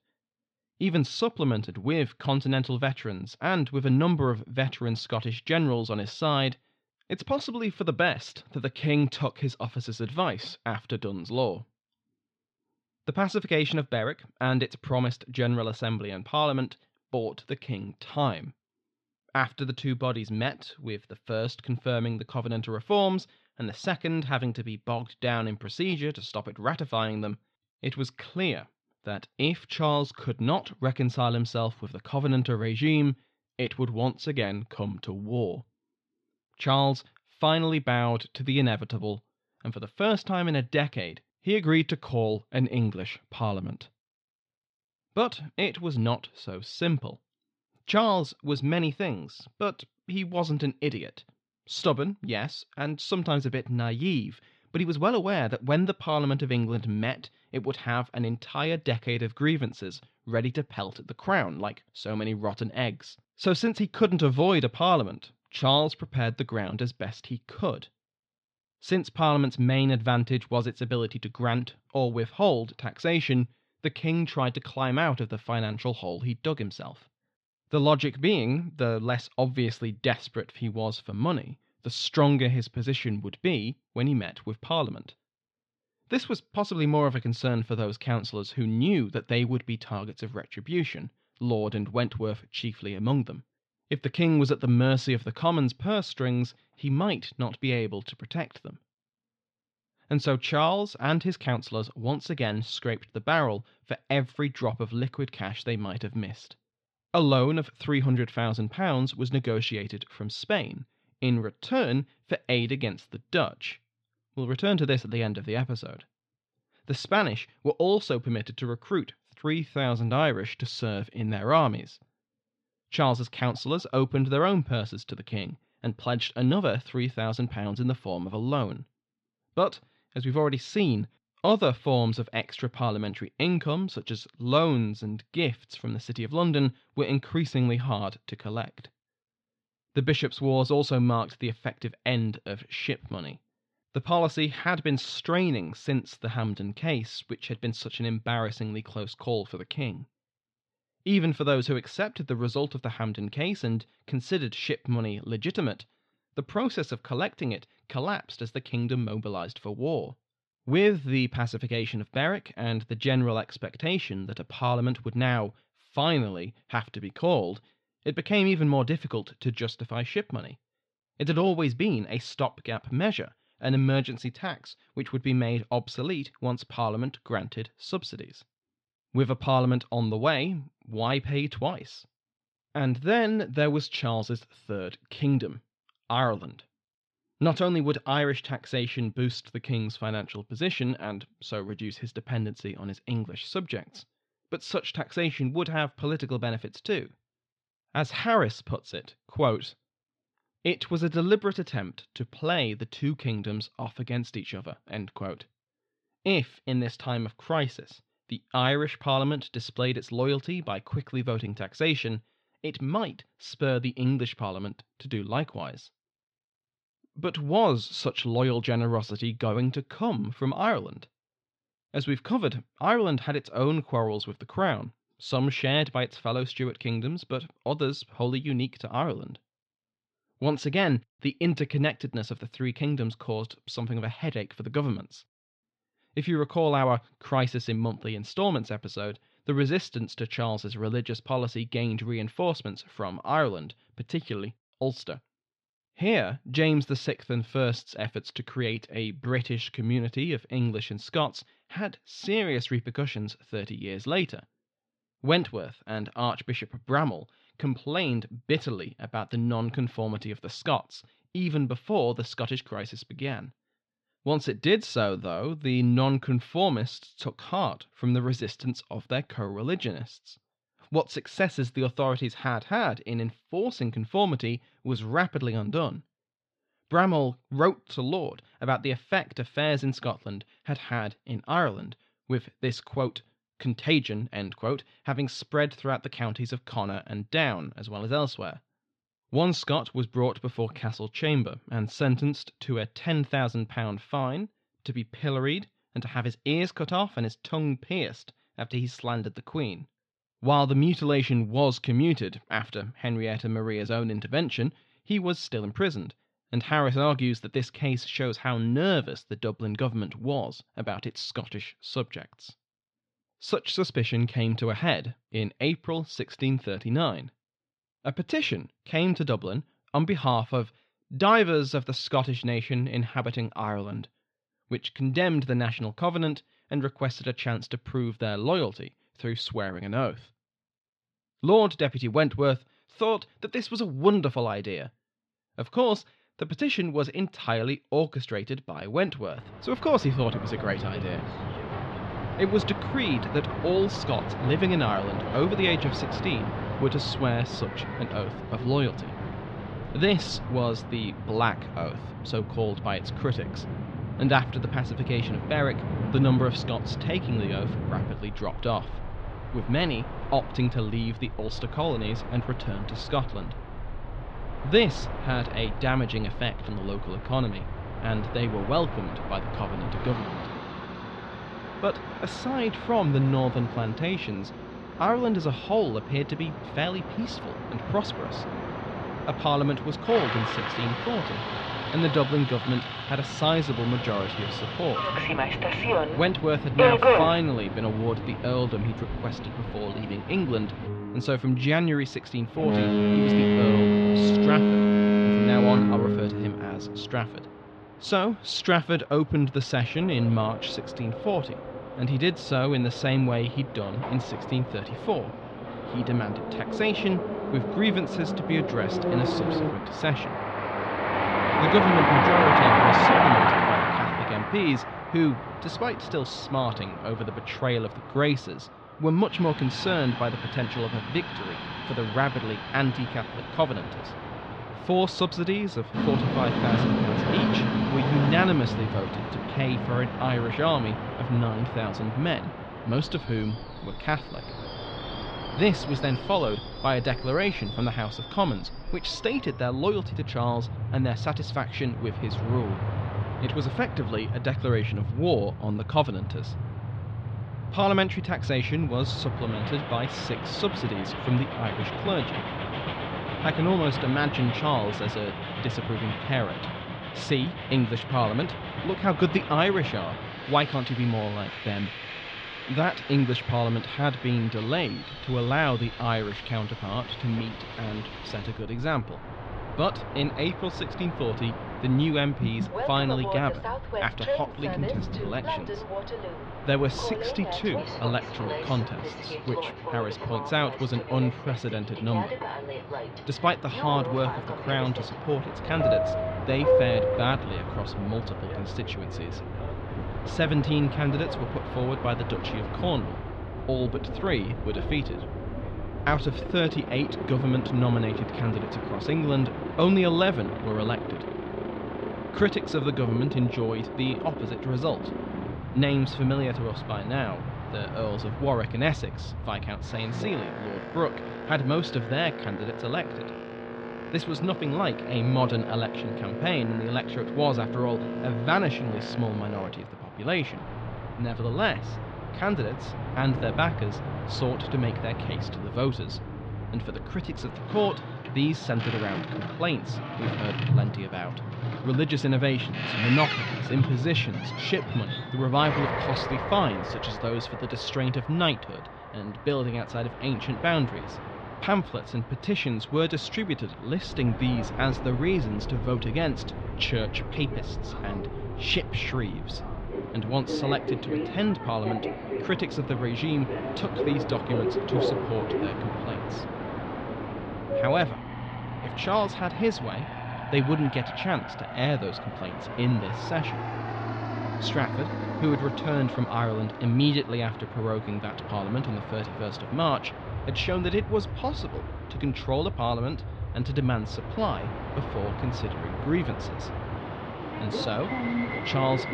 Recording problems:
muffled; slightly; fading above 4 kHz
train or aircraft noise; loud; from 5:40 on; 3 dB below the speech

